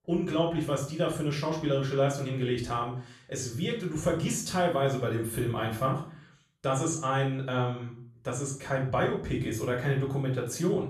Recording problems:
off-mic speech; far
room echo; slight; dies away in 0.4 s

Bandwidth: 13.5 kHz